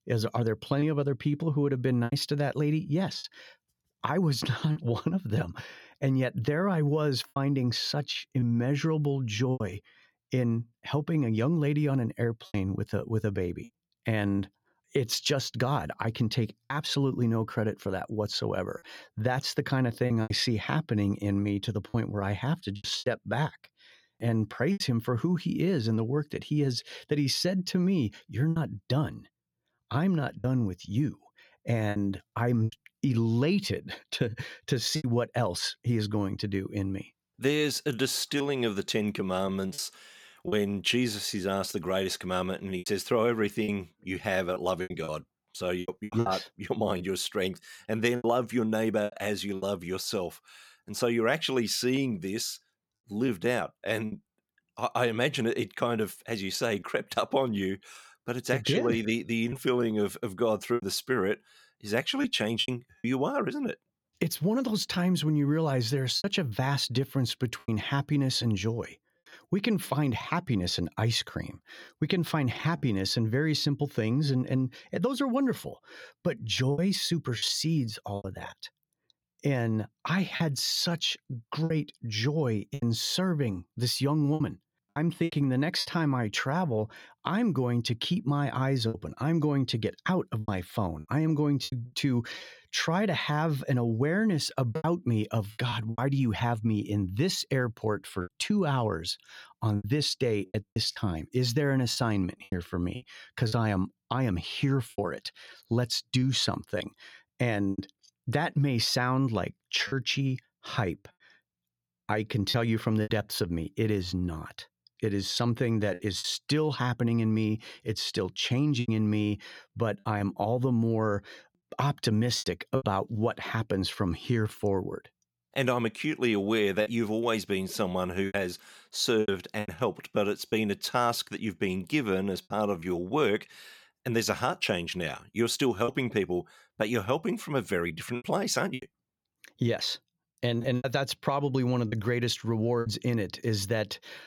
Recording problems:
choppy; occasionally; 5% of the speech affected

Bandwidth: 17.5 kHz